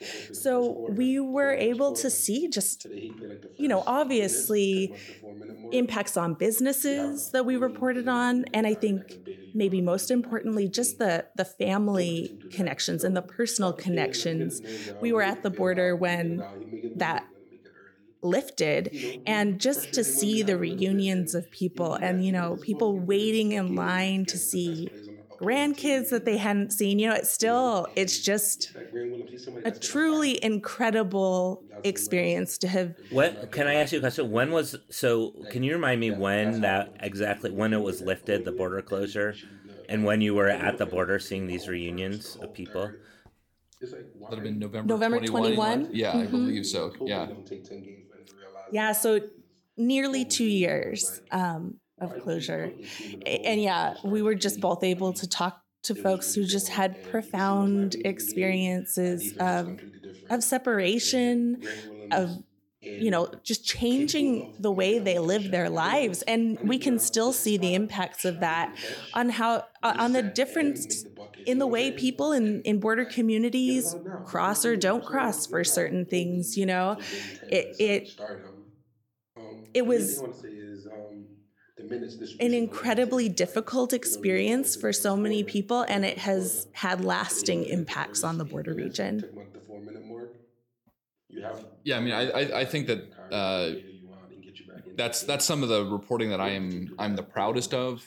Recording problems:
voice in the background; noticeable; throughout; 15 dB below the speech

